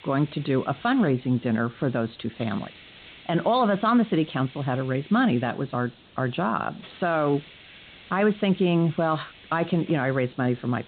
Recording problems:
high frequencies cut off; severe; nothing above 4 kHz
hiss; faint; throughout; 20 dB below the speech

